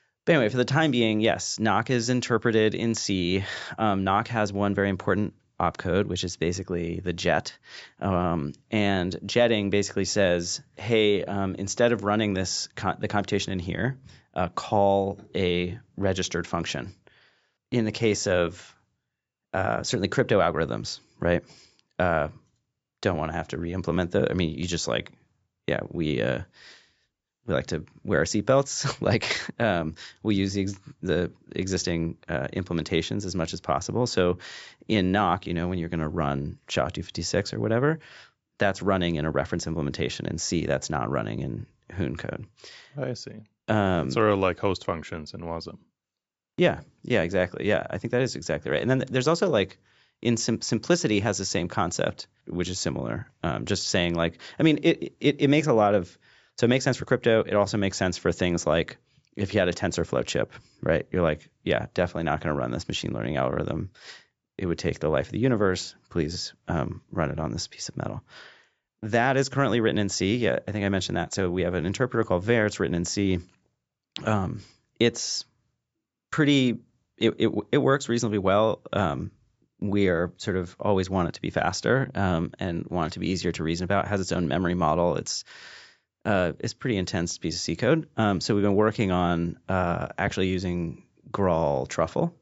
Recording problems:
high frequencies cut off; noticeable; nothing above 8 kHz

